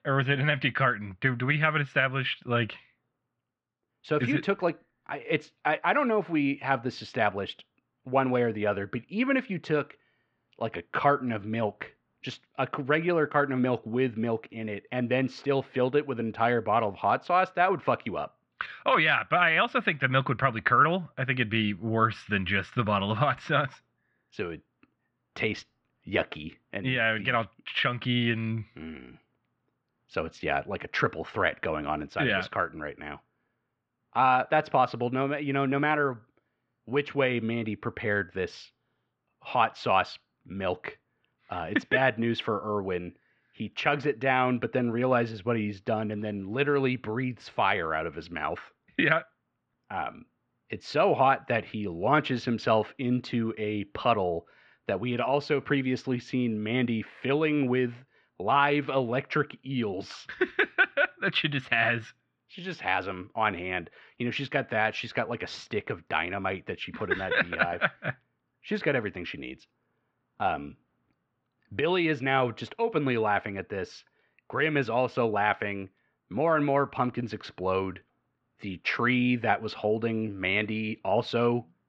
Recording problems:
muffled; very; fading above 3.5 kHz

